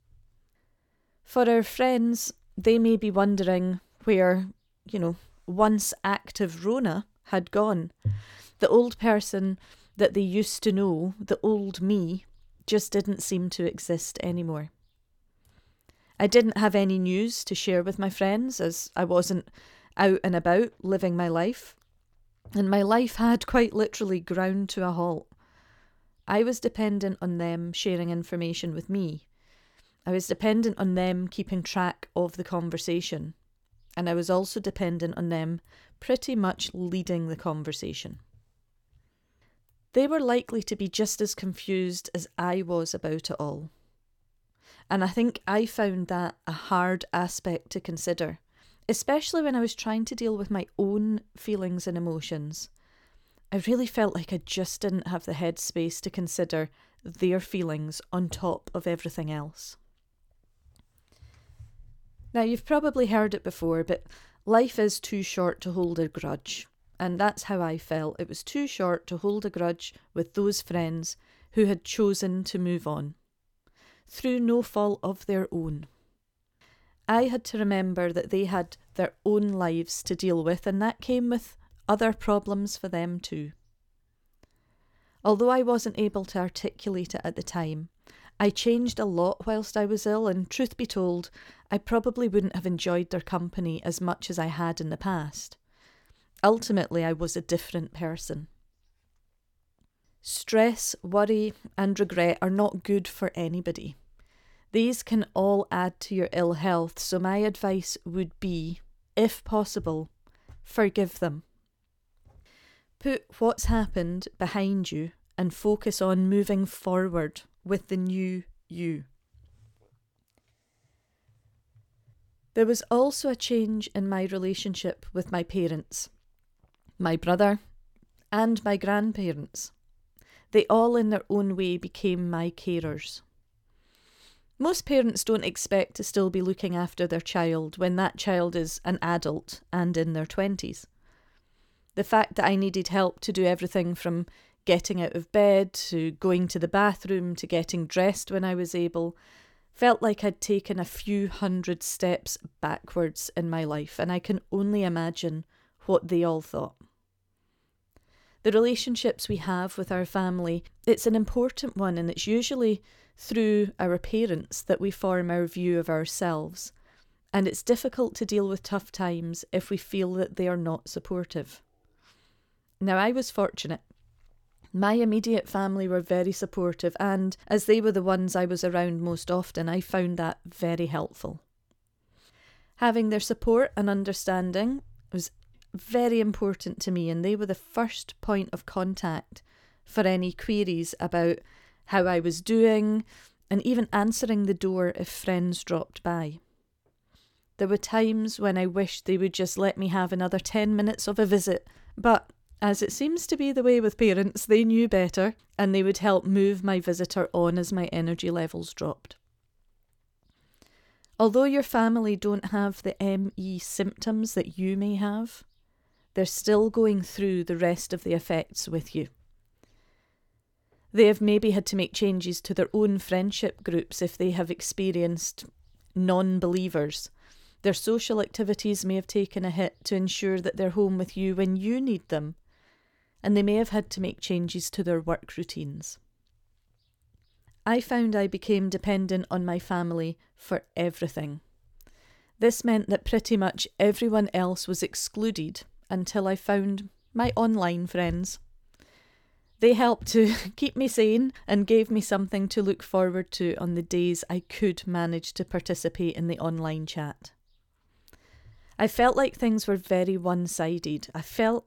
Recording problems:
none

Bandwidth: 18 kHz